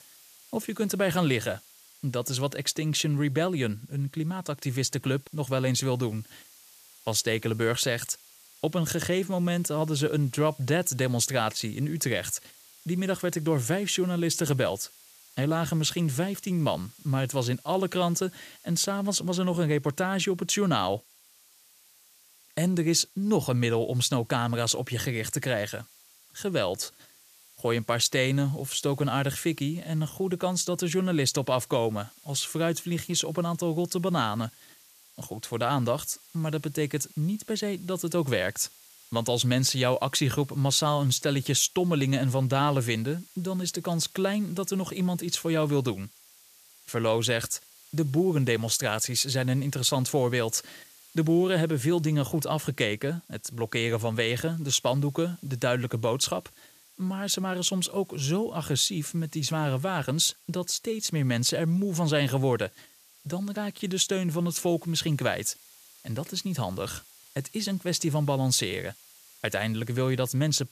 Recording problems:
hiss; faint; throughout; 25 dB below the speech

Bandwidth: 14.5 kHz